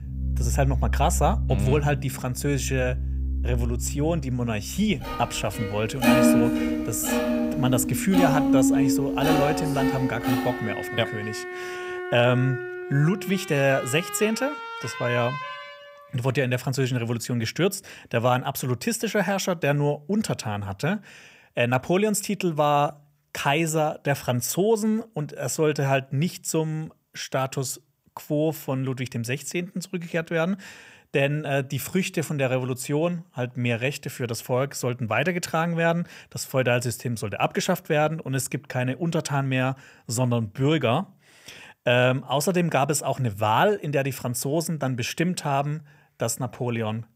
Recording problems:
background music; loud; until 16 s; 1 dB below the speech

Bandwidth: 15.5 kHz